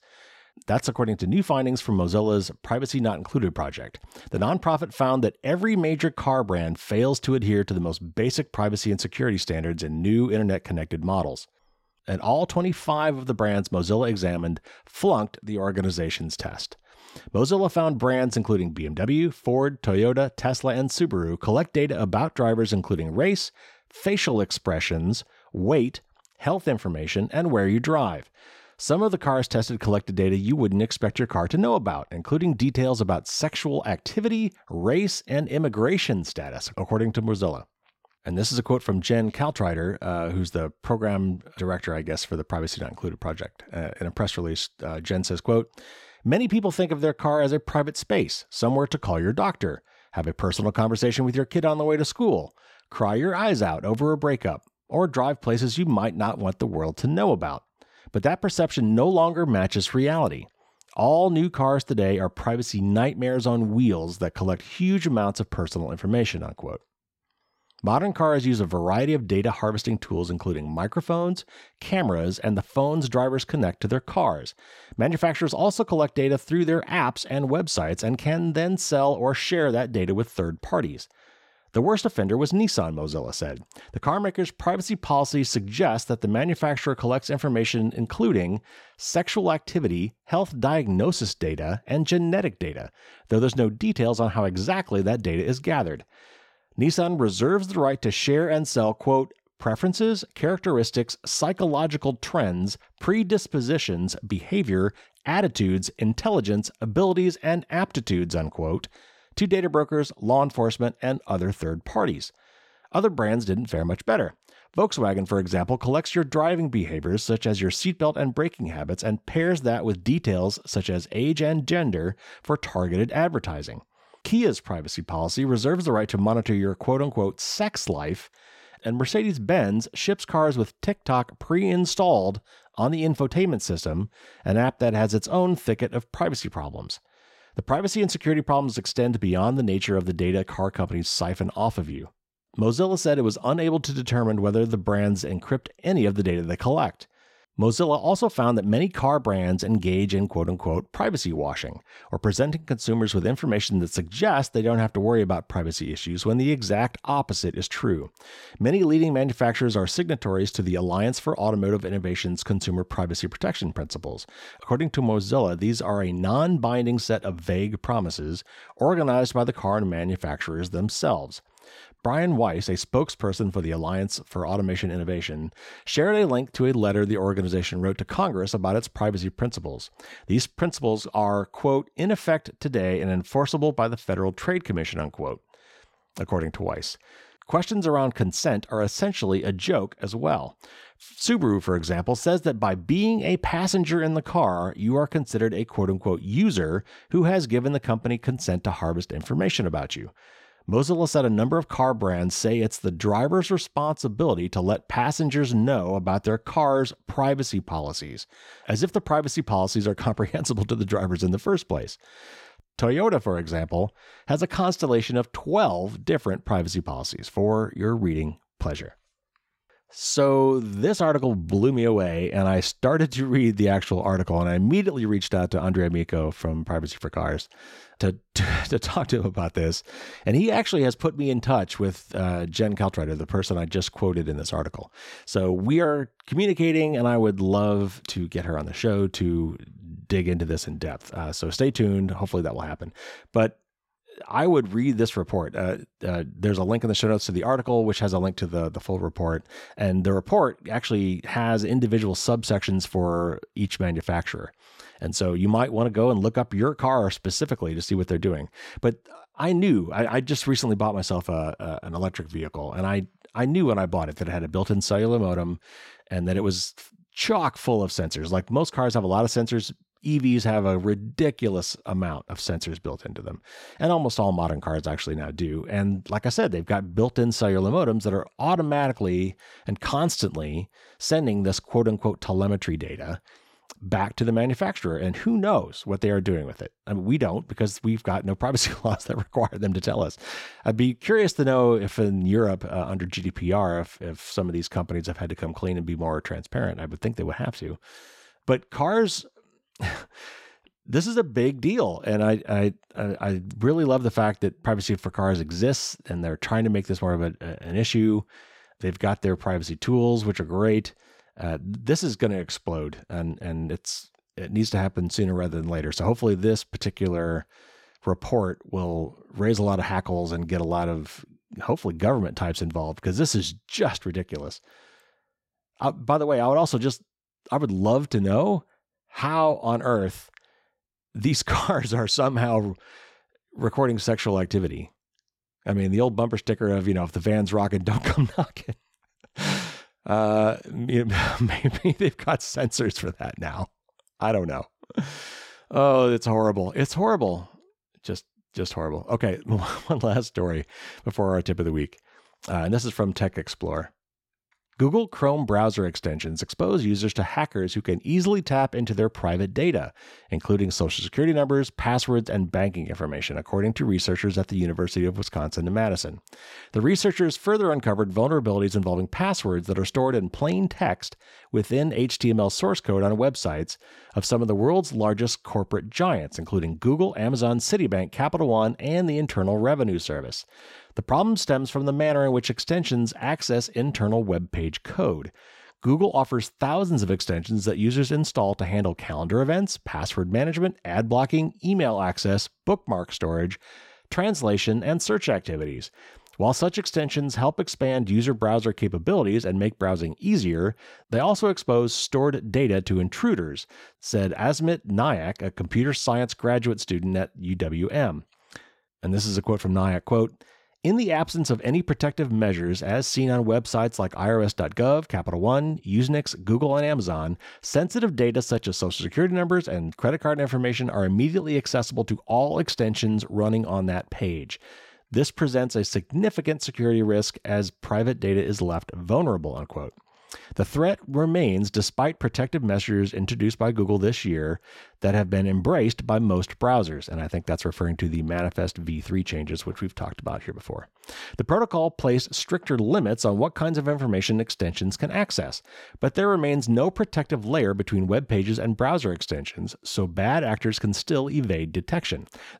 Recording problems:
none

